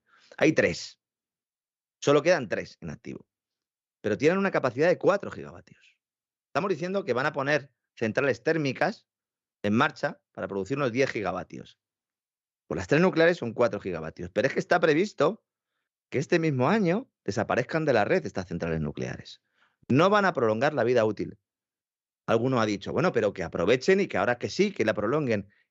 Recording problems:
none

